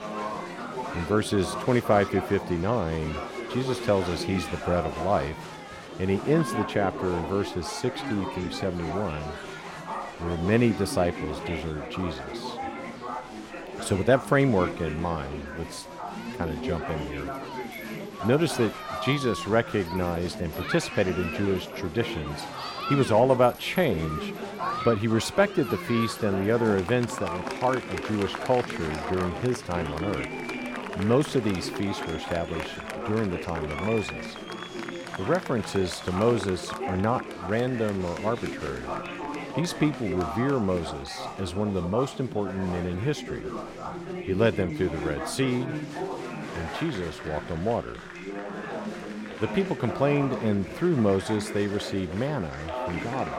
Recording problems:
chatter from many people; loud; throughout; 7 dB below the speech

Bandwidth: 16.5 kHz